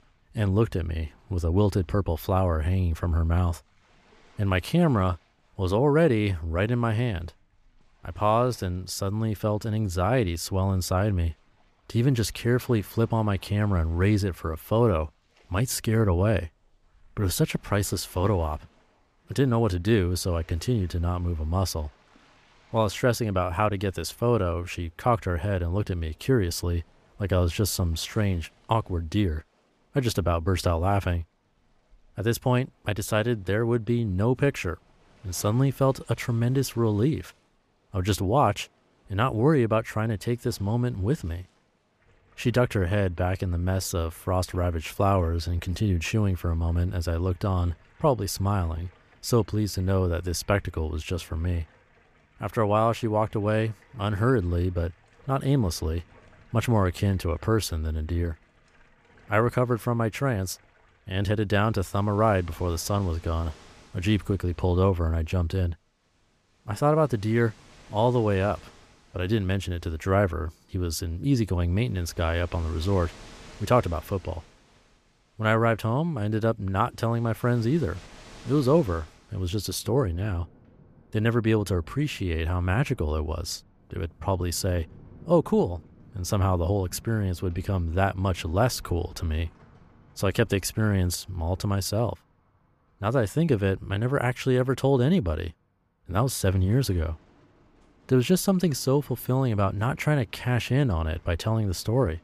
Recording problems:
rain or running water; faint; throughout; 30 dB below the speech

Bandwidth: 14.5 kHz